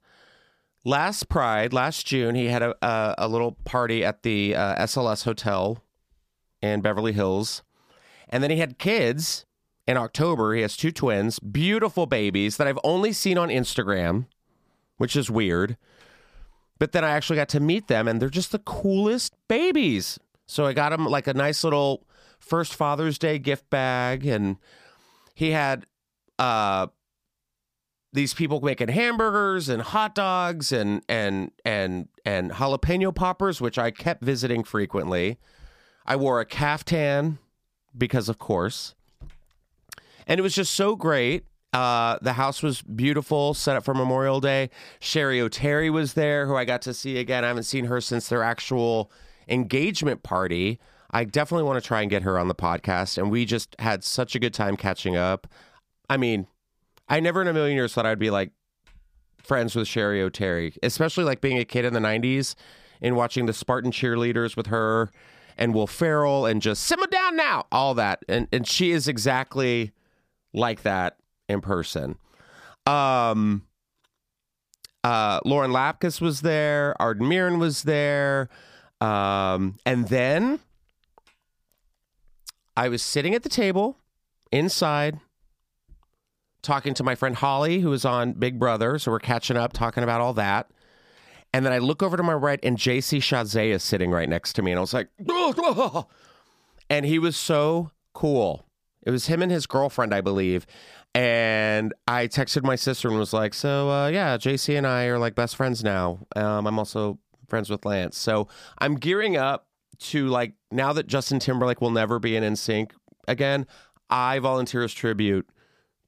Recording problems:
none

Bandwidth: 15 kHz